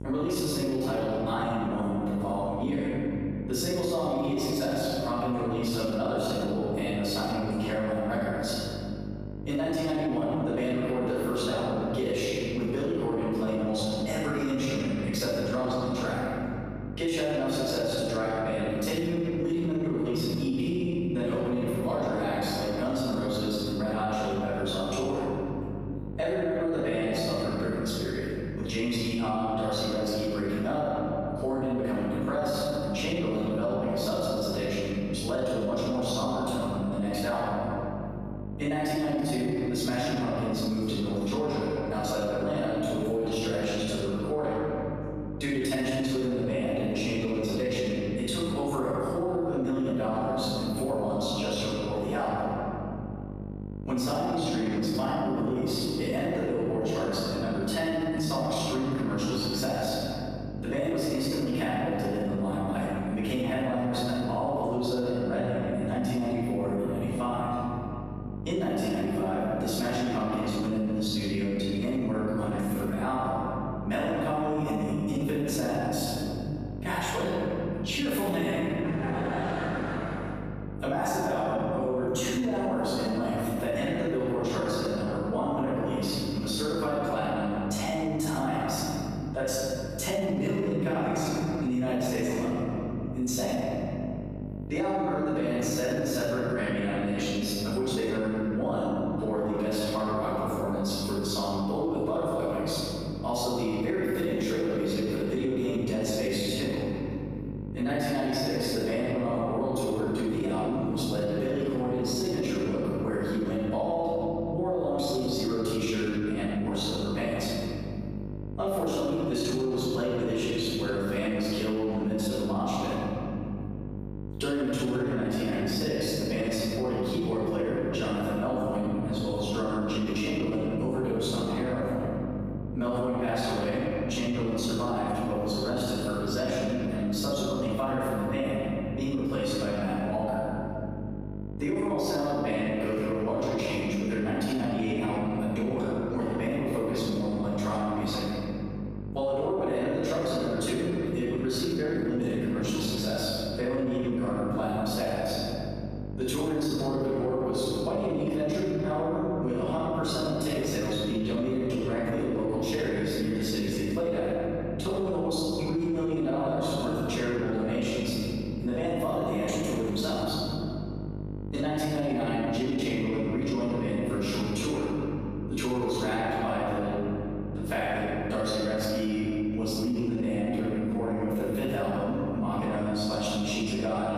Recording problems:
room echo; strong; dies away in 3 s
off-mic speech; far
squashed, flat; somewhat
electrical hum; noticeable; throughout; 50 Hz, 20 dB below the speech

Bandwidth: 14.5 kHz